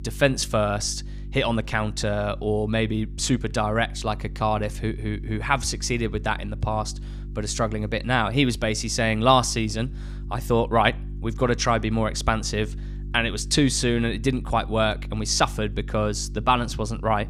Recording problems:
electrical hum; faint; throughout; 50 Hz, 25 dB below the speech

